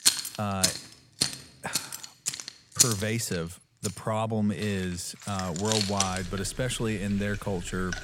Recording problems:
household noises; very loud; throughout; 2 dB above the speech

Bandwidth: 18 kHz